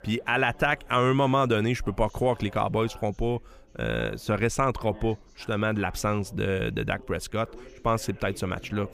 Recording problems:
background chatter; faint; throughout; 3 voices, 25 dB below the speech

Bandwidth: 15 kHz